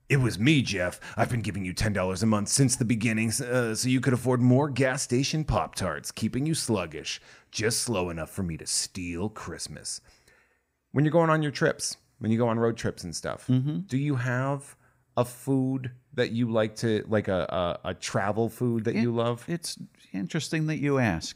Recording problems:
none

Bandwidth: 15.5 kHz